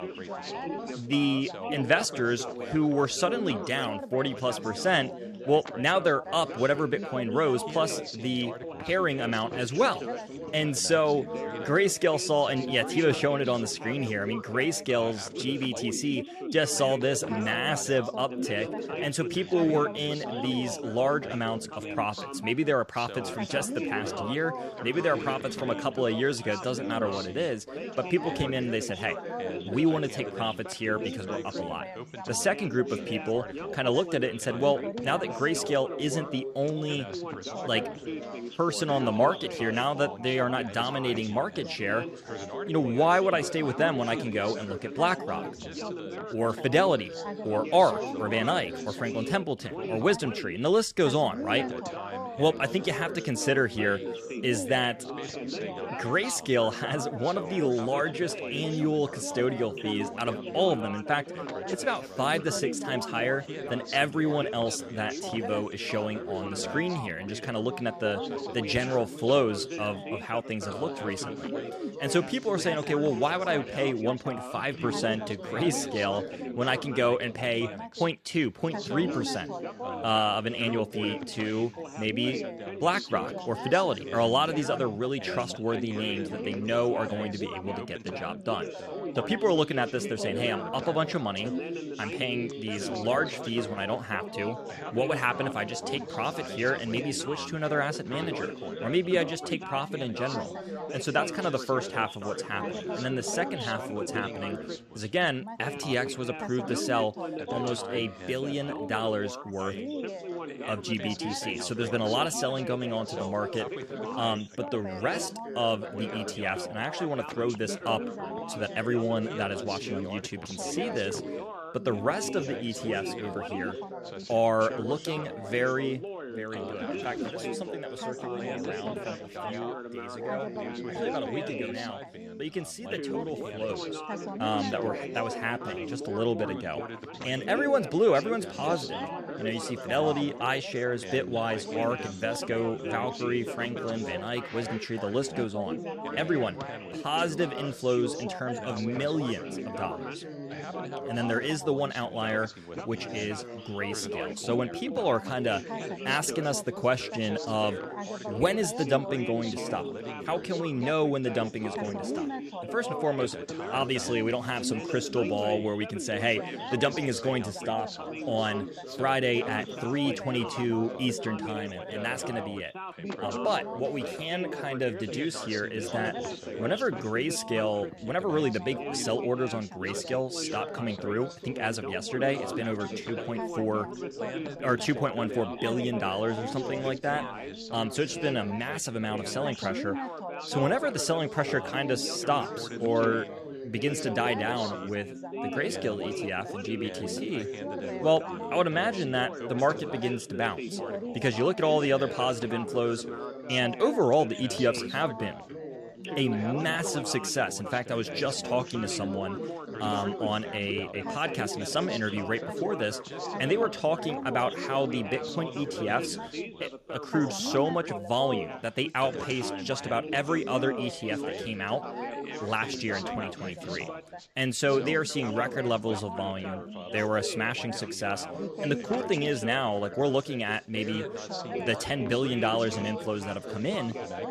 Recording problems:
background chatter; loud; throughout; 4 voices, 7 dB below the speech

